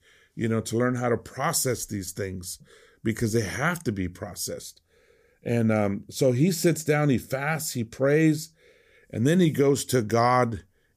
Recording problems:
none

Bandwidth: 15 kHz